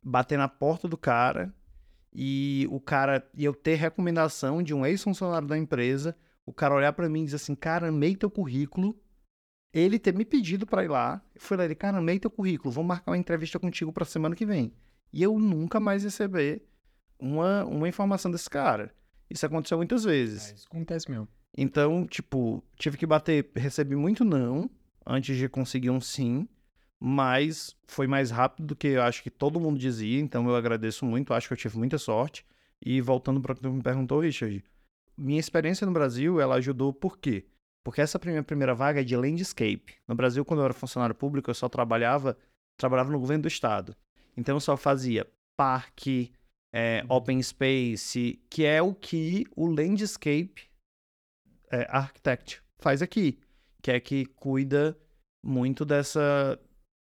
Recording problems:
none

